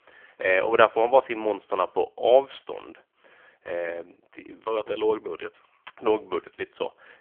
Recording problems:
phone-call audio; poor line; nothing above 3.5 kHz

